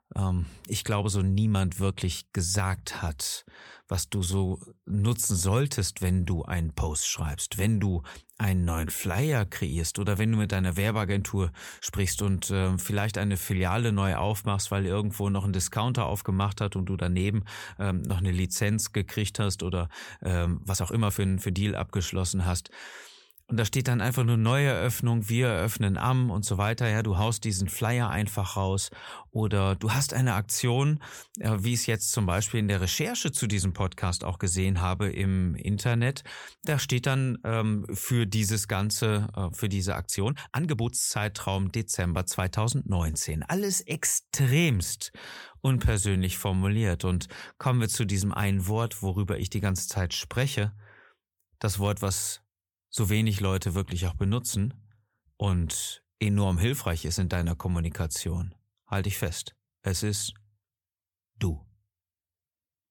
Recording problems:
uneven, jittery; strongly; from 1.5 to 53 s

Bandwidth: 18.5 kHz